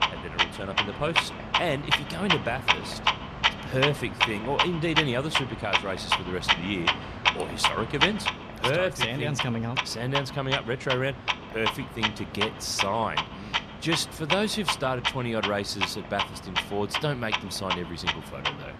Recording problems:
household noises; very loud; throughout; 2 dB above the speech

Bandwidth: 14 kHz